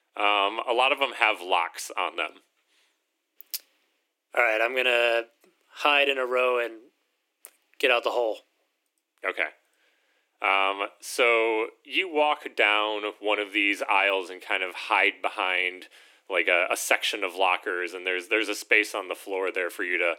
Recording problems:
thin; very; fading below 300 Hz

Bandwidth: 16.5 kHz